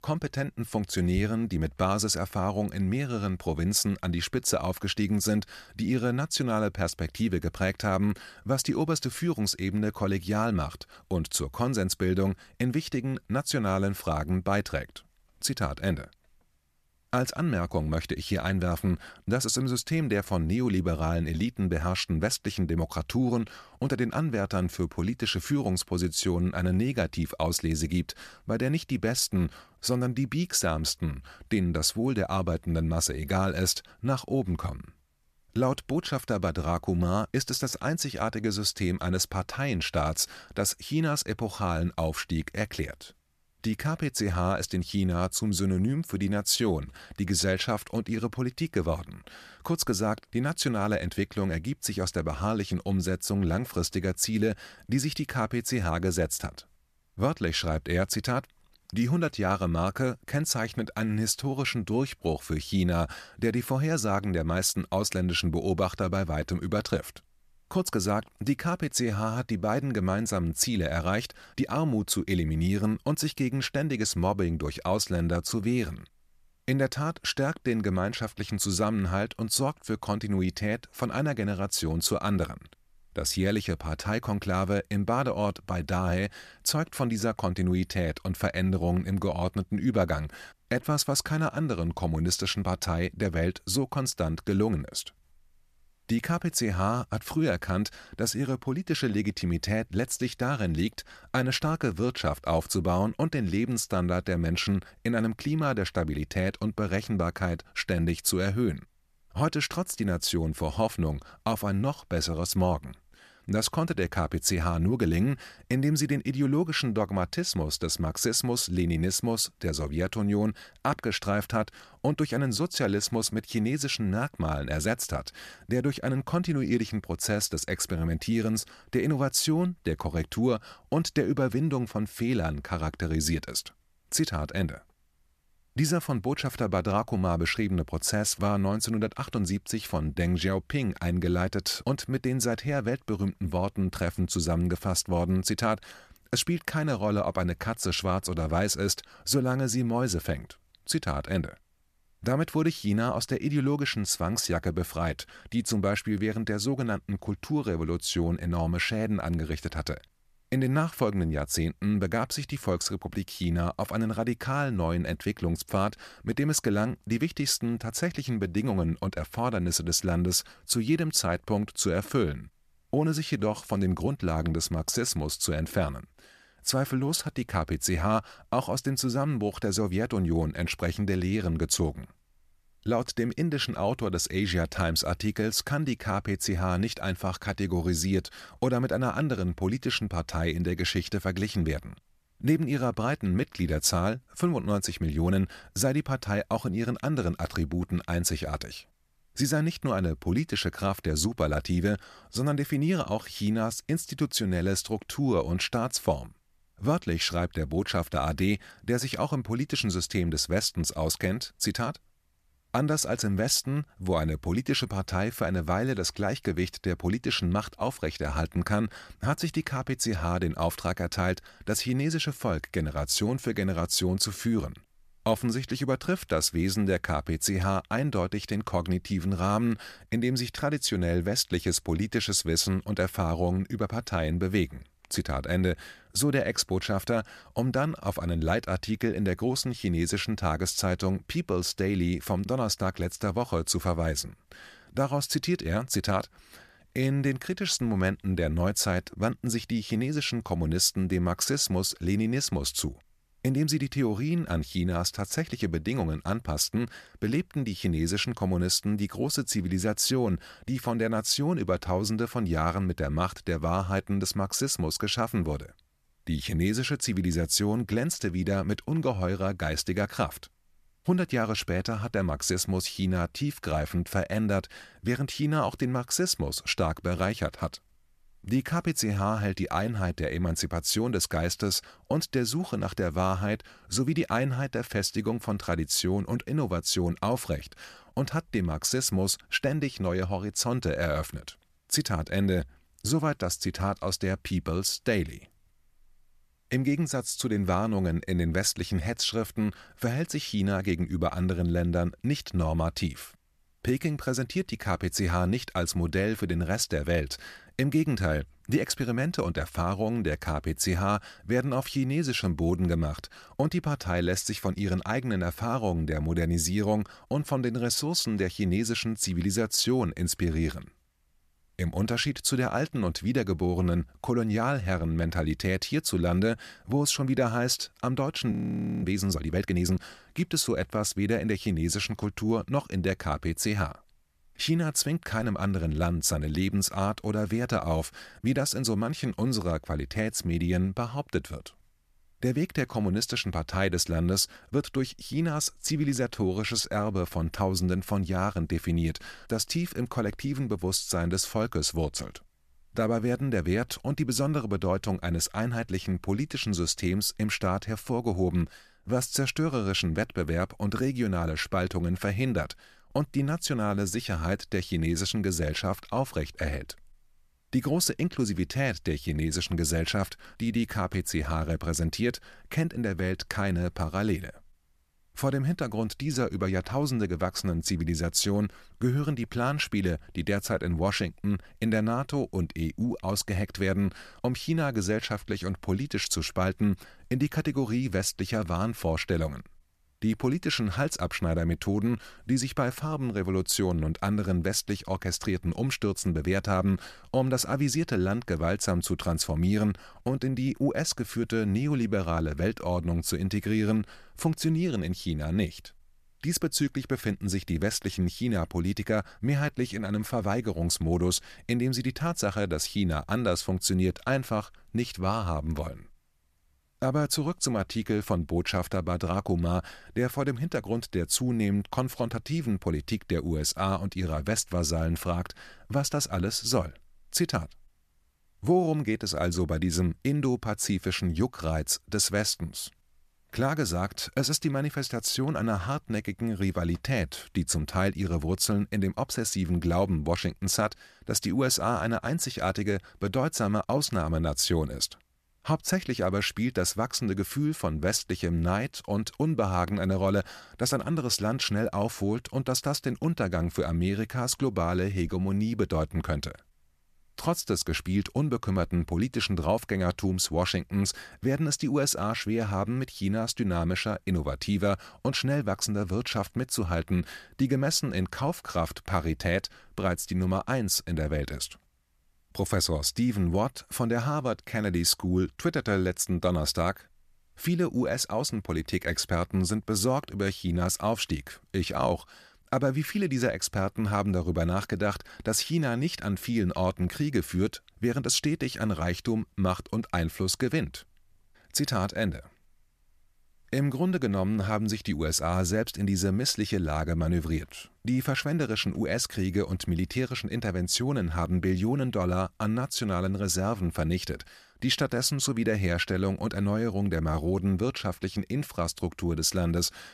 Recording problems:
audio freezing; at 5:29 for 0.5 s

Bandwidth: 14.5 kHz